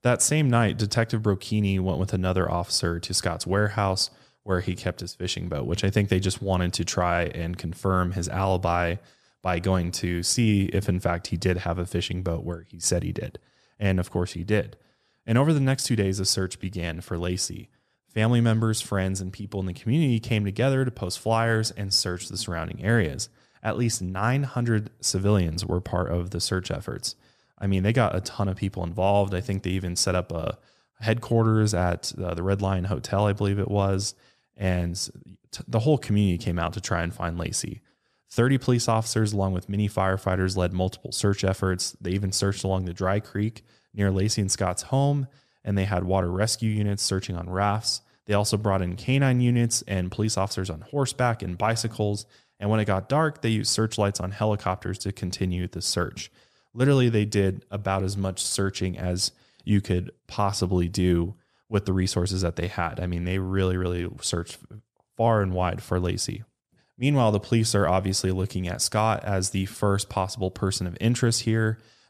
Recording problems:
none

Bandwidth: 14.5 kHz